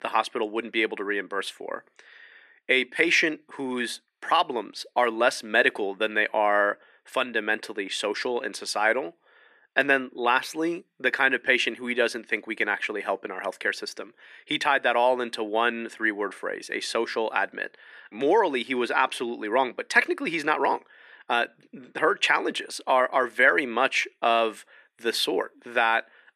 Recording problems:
thin; somewhat; fading below 300 Hz

